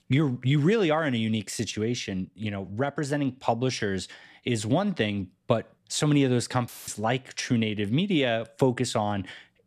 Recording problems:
audio cutting out; filled with static; at 6.5 s

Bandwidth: 14 kHz